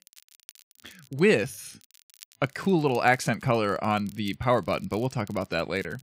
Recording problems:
crackle, like an old record; faint; 25 dB below the speech

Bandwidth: 15.5 kHz